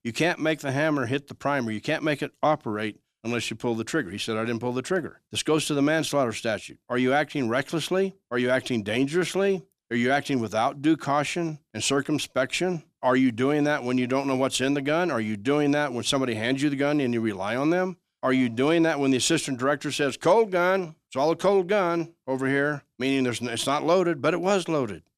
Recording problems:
none

